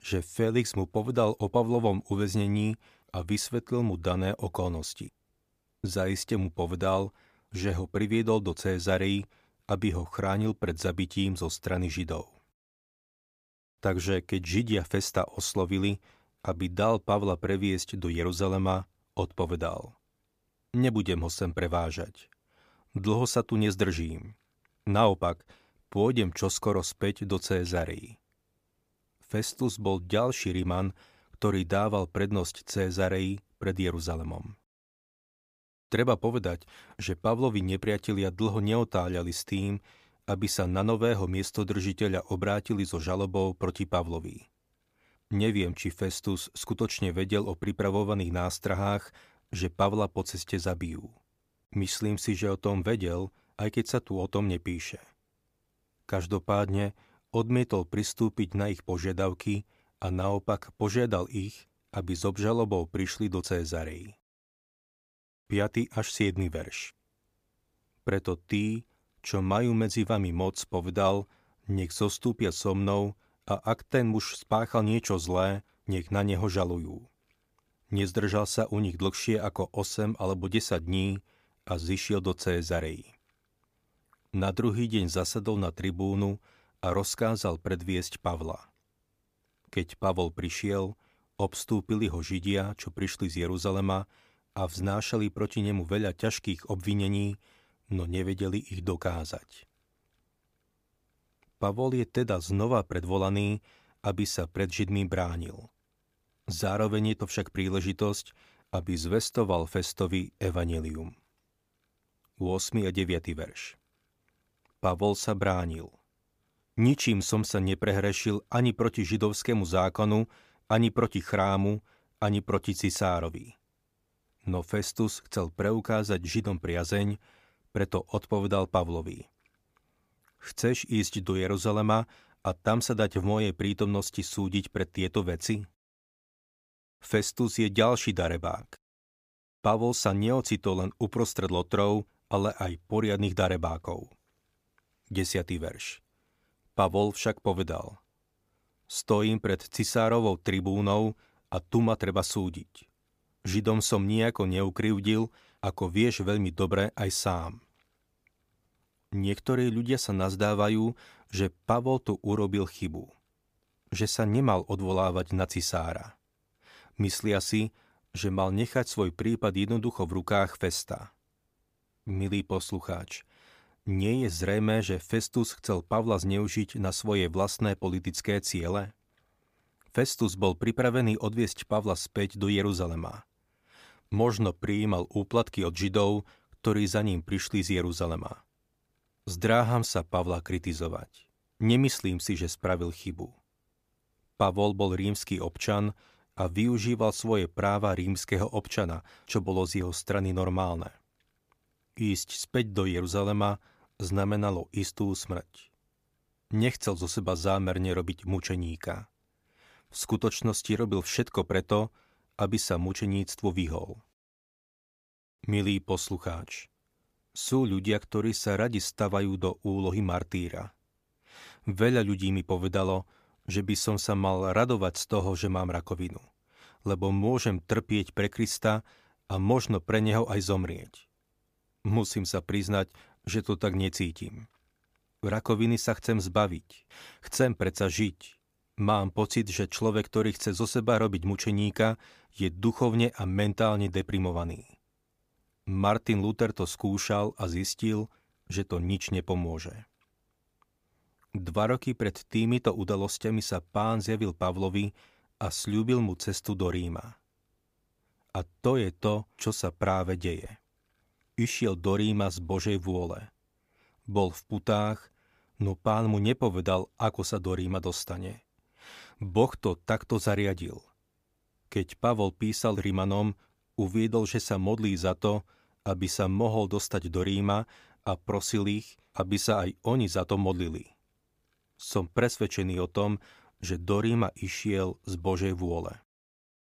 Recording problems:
none

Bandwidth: 15 kHz